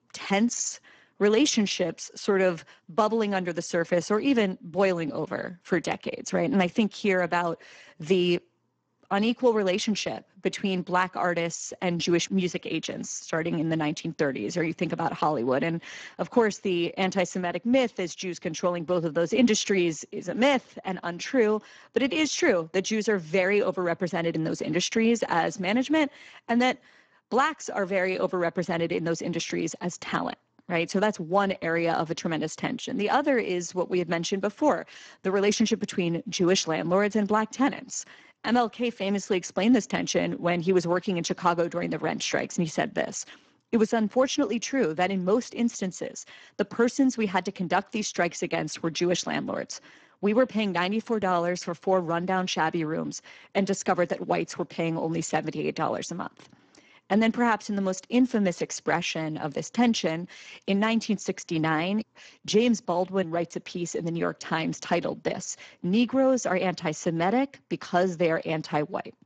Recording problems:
garbled, watery; badly

